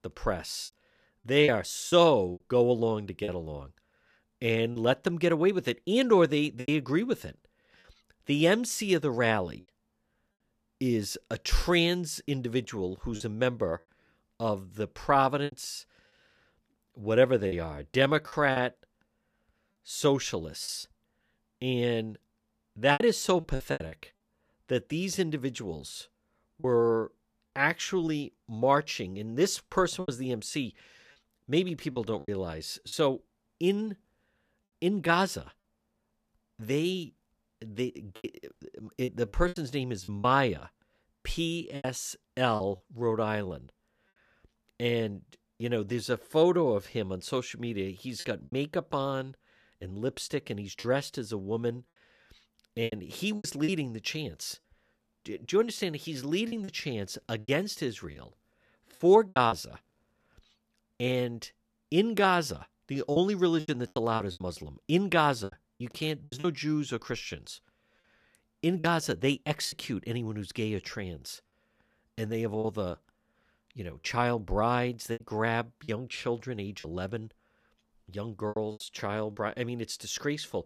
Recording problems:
choppy; very; 6% of the speech affected

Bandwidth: 14.5 kHz